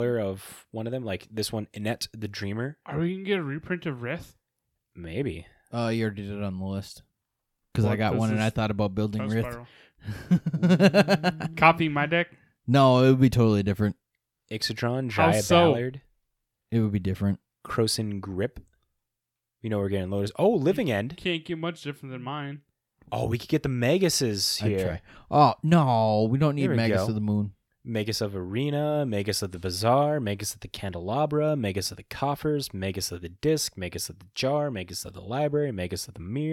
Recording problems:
abrupt cut into speech; at the start and the end

